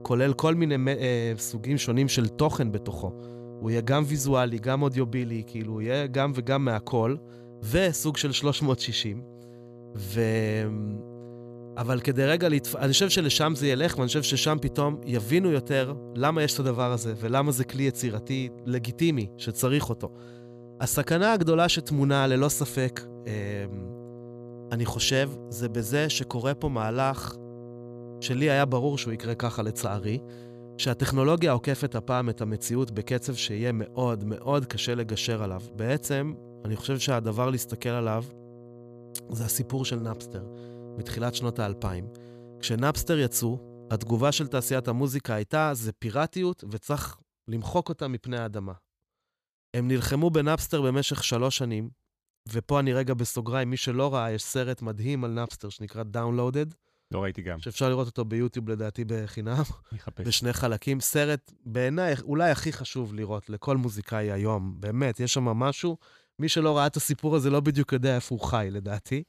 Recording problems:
electrical hum; noticeable; until 45 s; 60 Hz, 20 dB below the speech

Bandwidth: 14.5 kHz